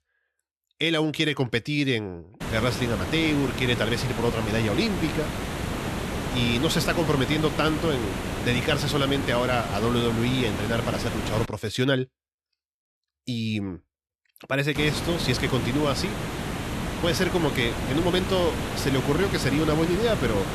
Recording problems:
hiss; loud; from 2.5 to 11 s and from 15 s on; 5 dB below the speech

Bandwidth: 13.5 kHz